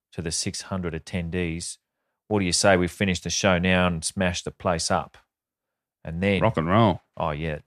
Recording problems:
none

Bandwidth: 14.5 kHz